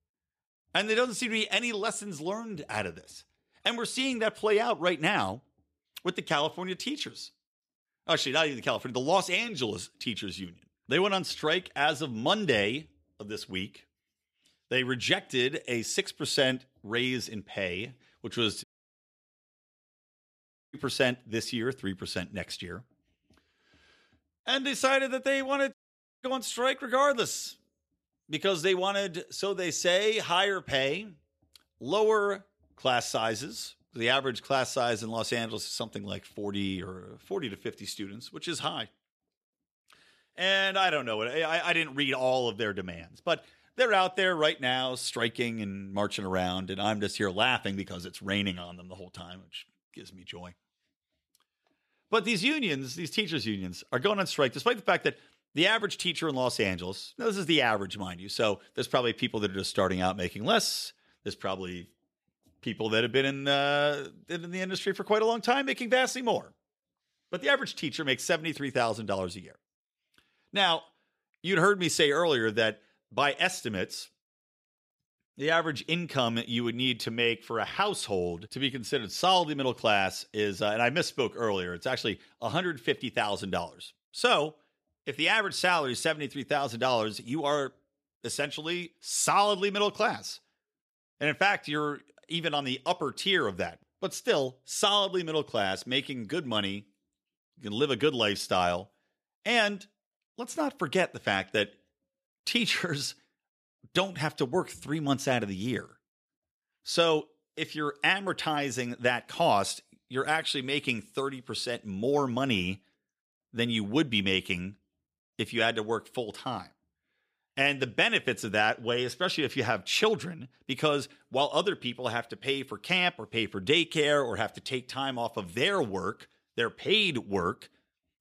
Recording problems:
audio cutting out; at 19 s for 2 s and at 26 s

